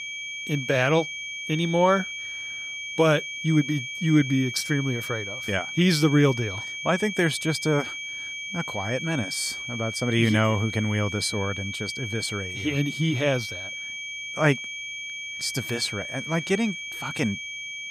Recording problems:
high-pitched whine; loud; throughout; 2.5 kHz, 6 dB below the speech

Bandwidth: 15.5 kHz